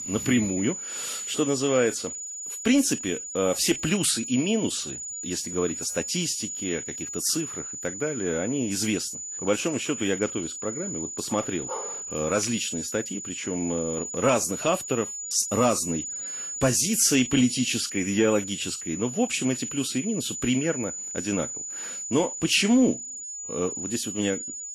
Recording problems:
garbled, watery; slightly; nothing above 12.5 kHz
high-pitched whine; loud; throughout; 7 kHz, 6 dB below the speech
dog barking; faint; at 12 s; peak 10 dB below the speech

